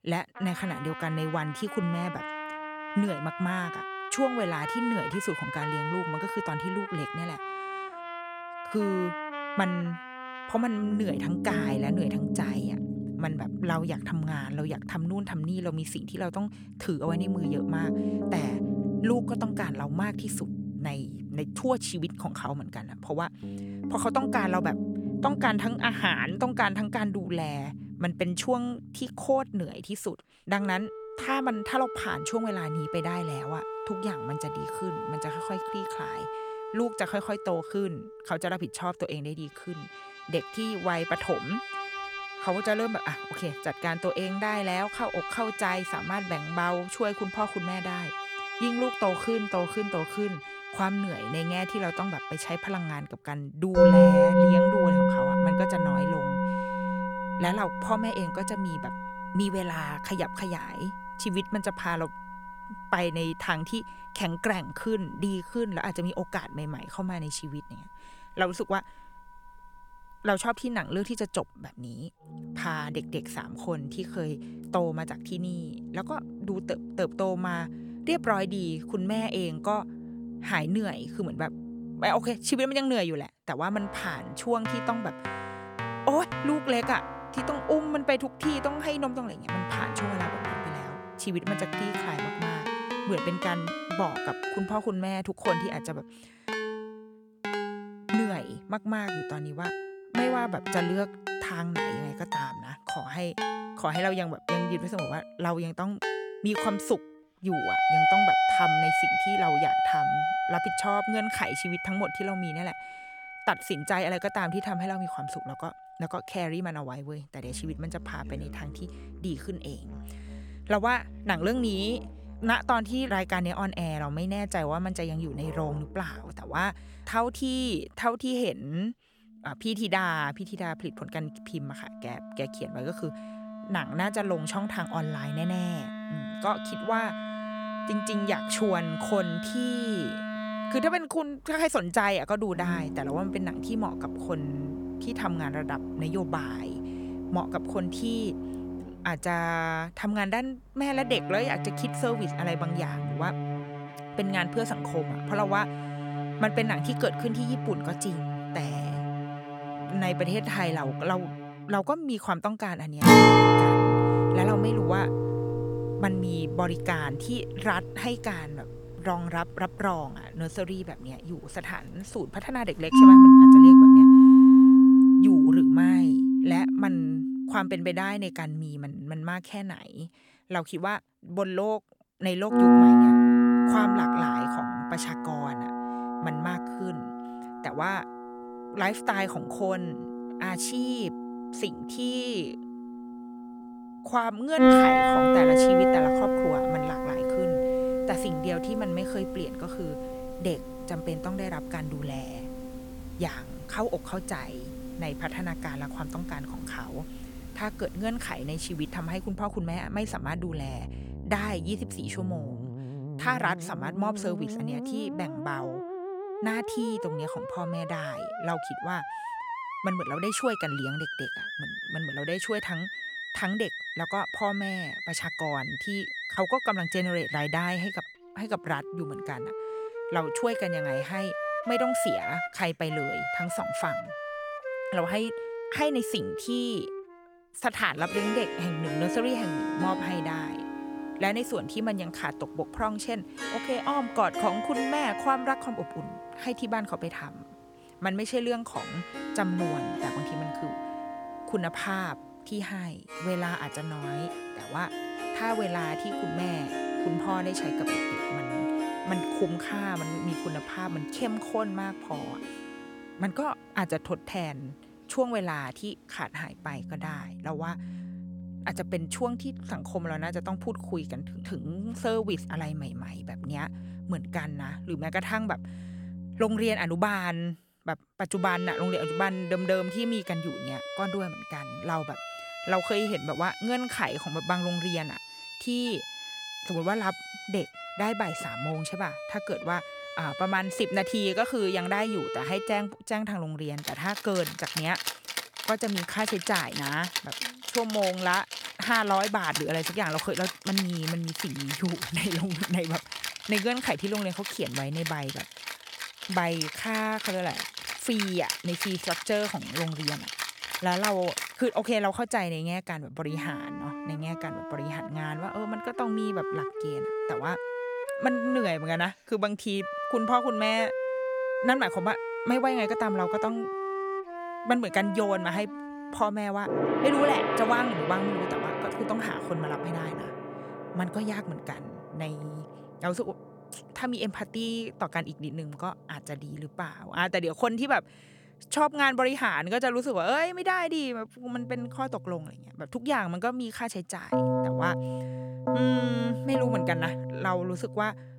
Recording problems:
background music; very loud; throughout; 4 dB above the speech

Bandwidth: 18 kHz